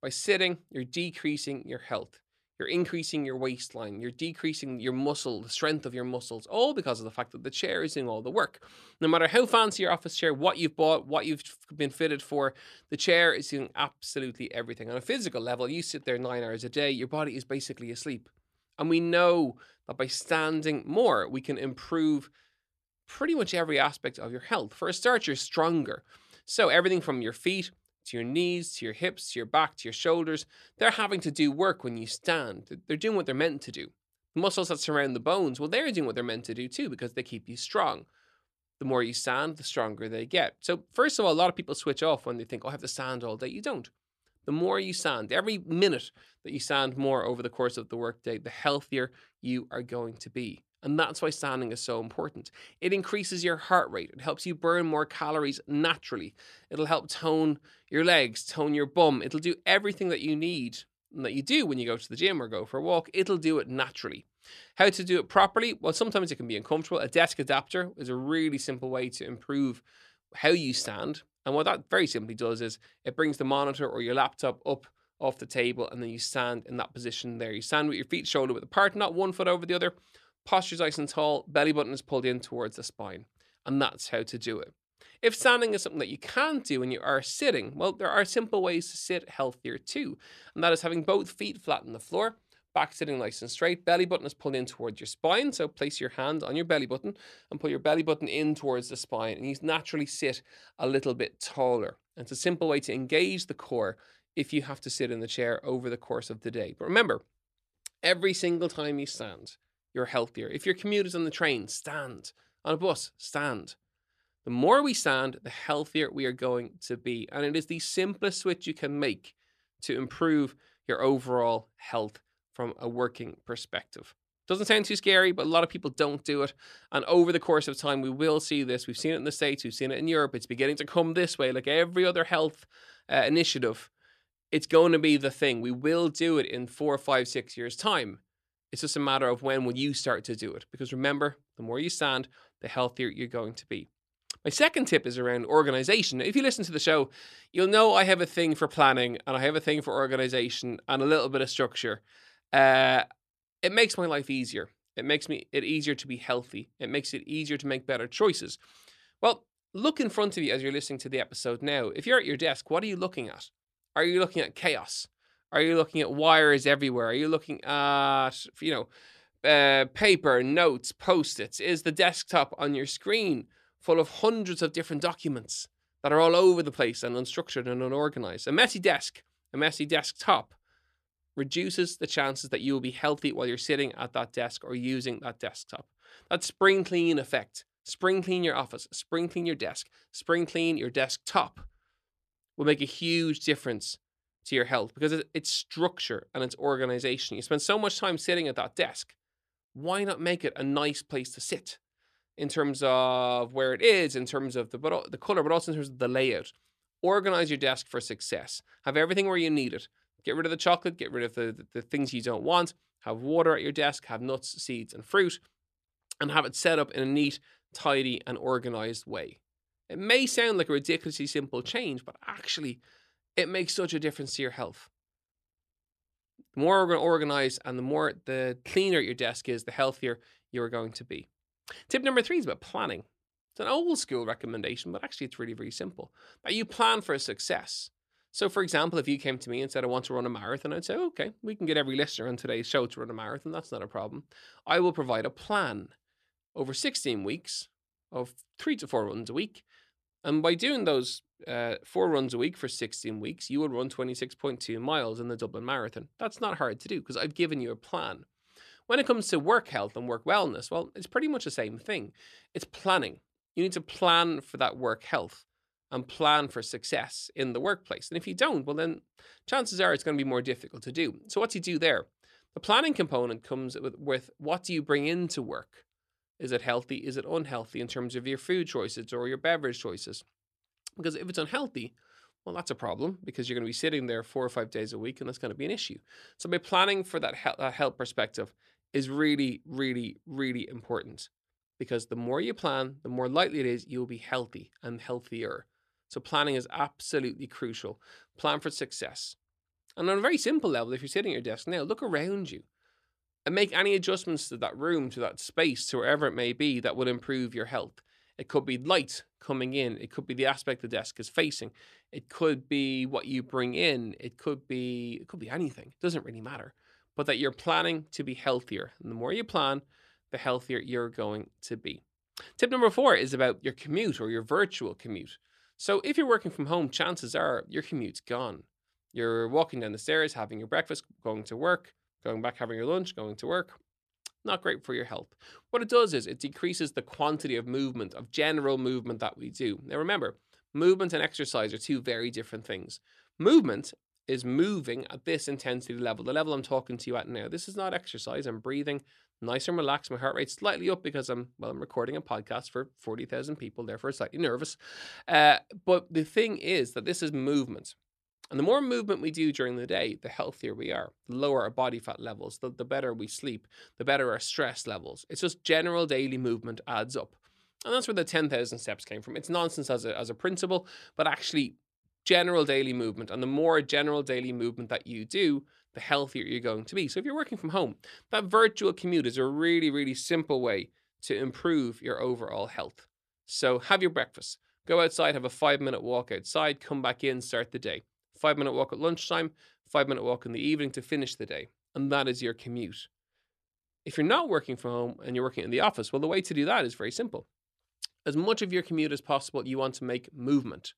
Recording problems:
none

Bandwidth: 13.5 kHz